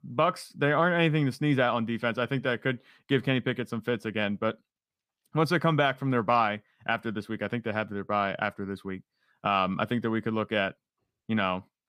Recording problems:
none

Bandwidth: 15 kHz